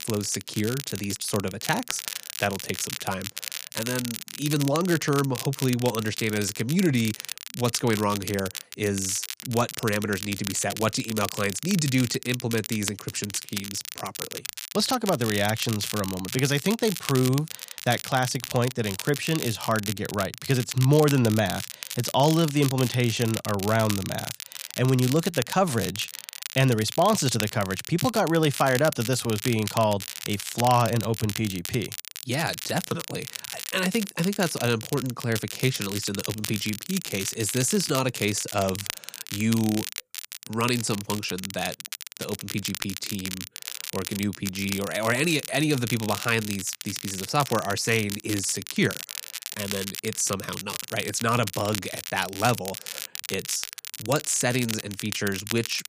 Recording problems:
crackle, like an old record; loud; 8 dB below the speech

